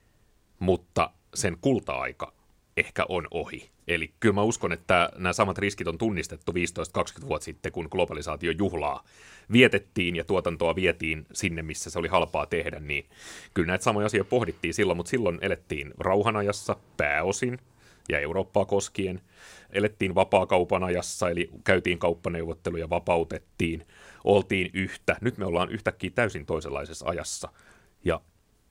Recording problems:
none

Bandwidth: 16 kHz